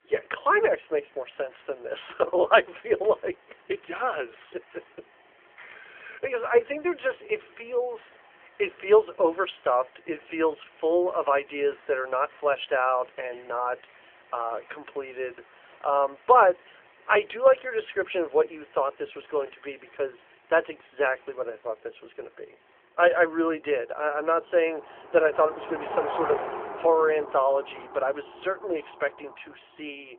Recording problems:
phone-call audio; nothing above 3 kHz
traffic noise; noticeable; throughout; 15 dB below the speech

